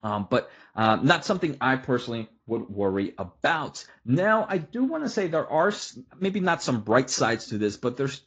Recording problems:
garbled, watery; slightly; nothing above 7.5 kHz

